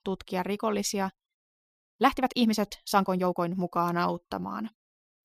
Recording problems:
uneven, jittery; strongly; from 2 to 4.5 s

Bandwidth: 15 kHz